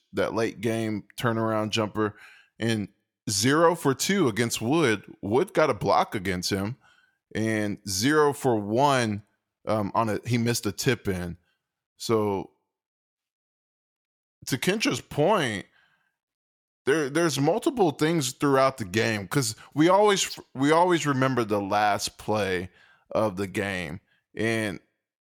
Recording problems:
none

